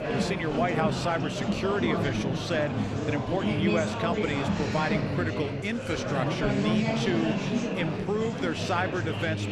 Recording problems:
murmuring crowd; very loud; throughout; 1 dB above the speech

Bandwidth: 14.5 kHz